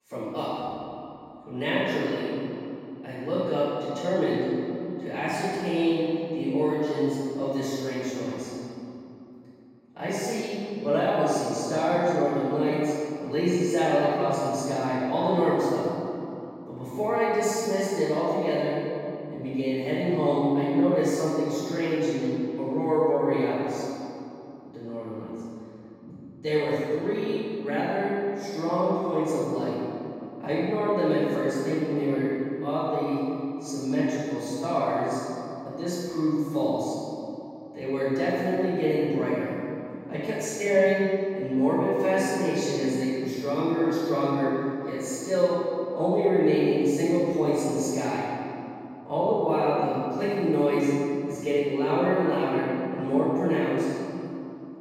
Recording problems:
room echo; strong; dies away in 2.8 s
off-mic speech; far

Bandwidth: 16 kHz